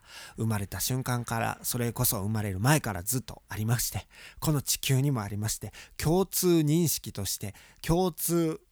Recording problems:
none

